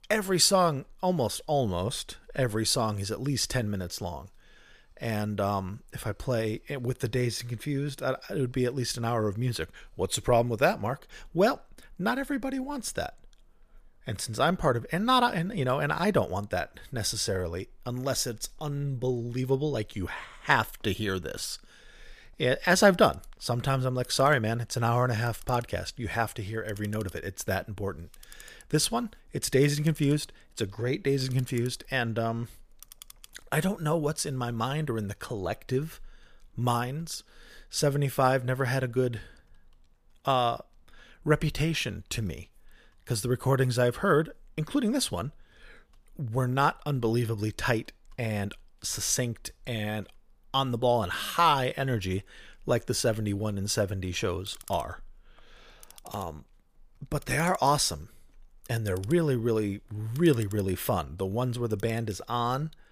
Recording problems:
household noises; faint; throughout; 25 dB below the speech

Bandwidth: 15 kHz